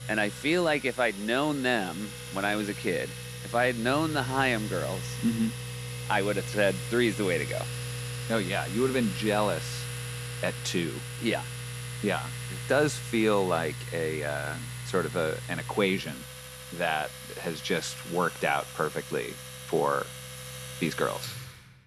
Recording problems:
household noises; loud; throughout; 8 dB below the speech

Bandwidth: 14 kHz